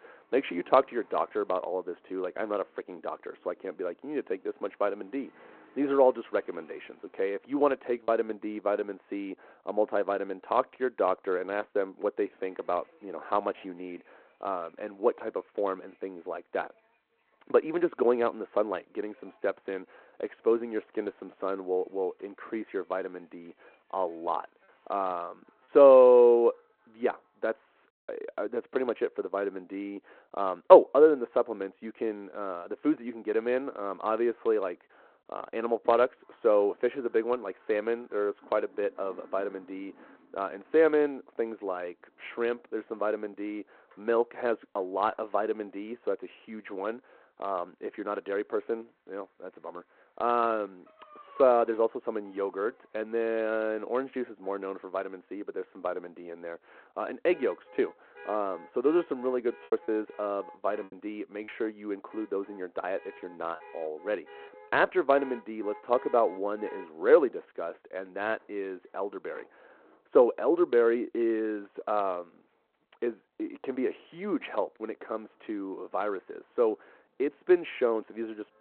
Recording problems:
phone-call audio; nothing above 4 kHz
muffled; very slightly; fading above 3 kHz
traffic noise; faint; throughout; 25 dB below the speech
choppy; occasionally; at 8 s, at 26 s and from 1:00 to 1:04; 4% of the speech affected

